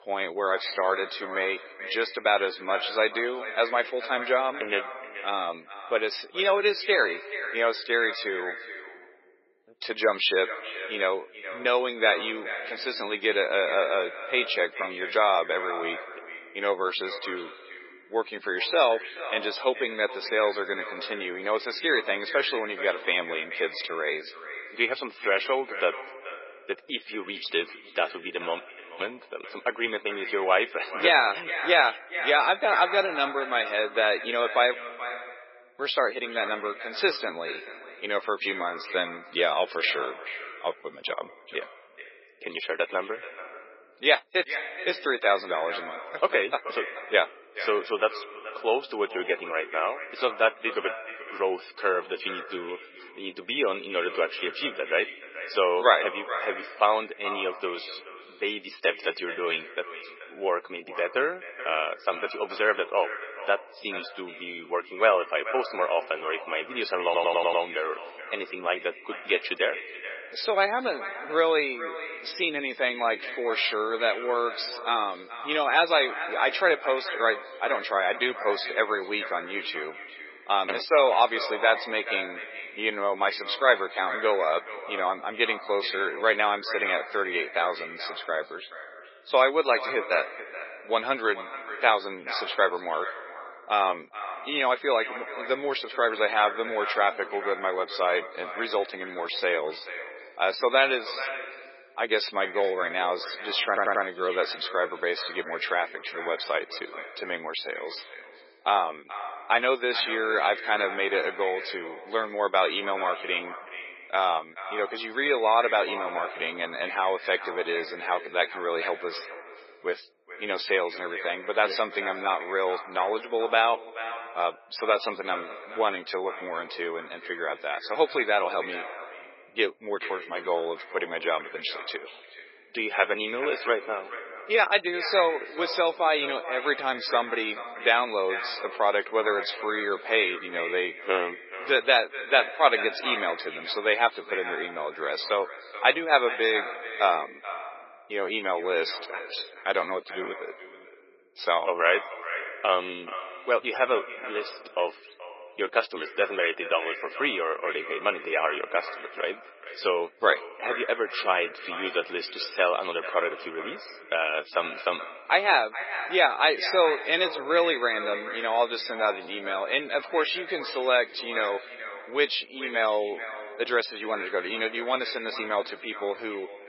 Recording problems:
echo of what is said; strong; throughout; 430 ms later, 10 dB below the speech
garbled, watery; badly; nothing above 5.5 kHz
thin; very; fading below 400 Hz
audio cutting out; at 29 s and at 35 s for 1 s
audio stuttering; at 1:07 and at 1:44

